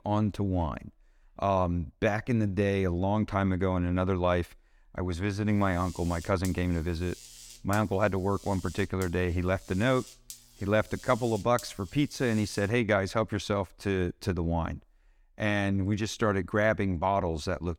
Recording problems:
electrical hum; noticeable; from 5.5 to 13 s; 60 Hz, 20 dB below the speech

